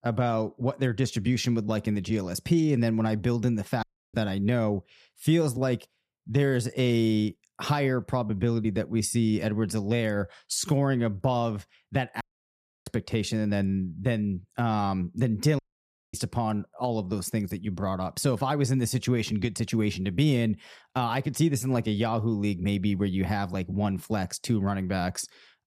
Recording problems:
audio cutting out; at 4 s, at 12 s for 0.5 s and at 16 s for 0.5 s

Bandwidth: 14.5 kHz